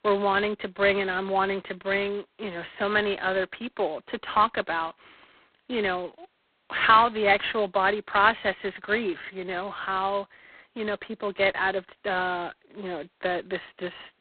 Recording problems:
phone-call audio; poor line; nothing above 4 kHz

